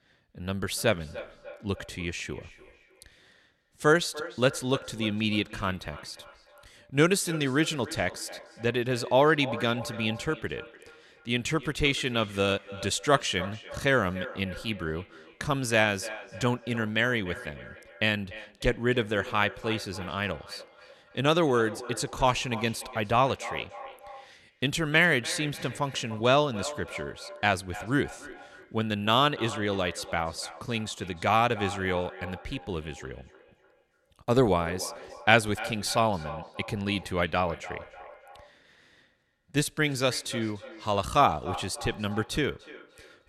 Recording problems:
echo of what is said; noticeable; throughout; 290 ms later, 15 dB below the speech

